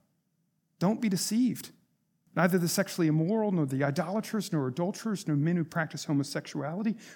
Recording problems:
none

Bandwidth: 17.5 kHz